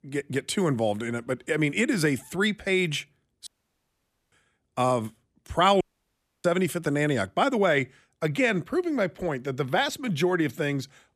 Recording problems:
audio cutting out; at 3.5 s for 1 s and at 6 s for 0.5 s

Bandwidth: 14.5 kHz